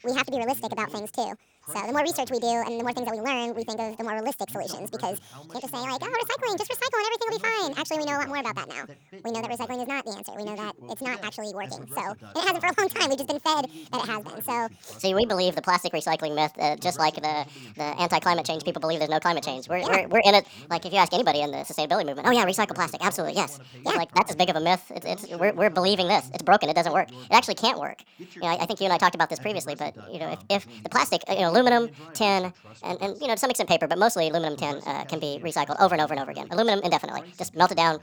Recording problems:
wrong speed and pitch; too fast and too high; 1.6 times normal speed
voice in the background; faint; throughout; 25 dB below the speech

